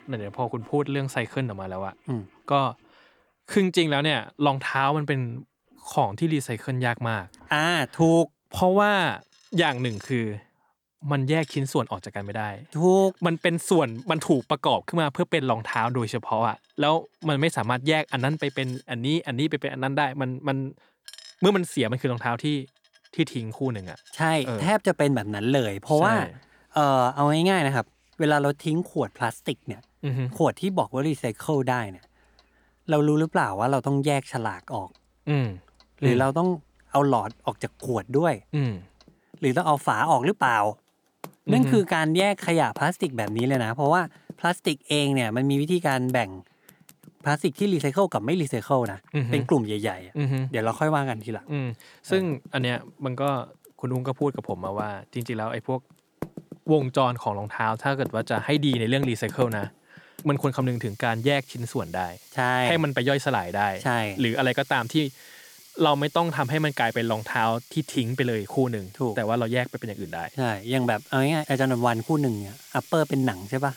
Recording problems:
household noises; faint; throughout; 20 dB below the speech

